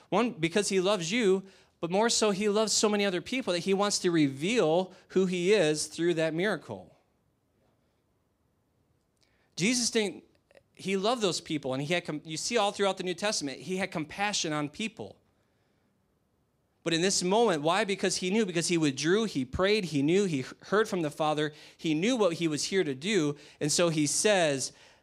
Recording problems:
none

